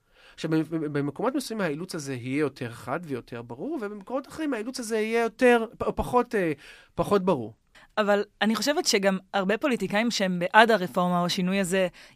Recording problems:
none

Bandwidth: 15 kHz